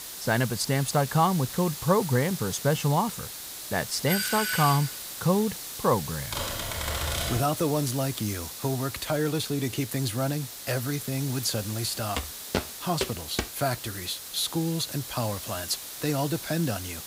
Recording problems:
hiss; loud; throughout; 8 dB below the speech
doorbell; loud; at 4 s; peak 1 dB above the speech
keyboard typing; noticeable; from 6.5 to 7.5 s; peak 1 dB below the speech
footsteps; noticeable; from 12 to 13 s; peak 4 dB below the speech

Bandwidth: 15.5 kHz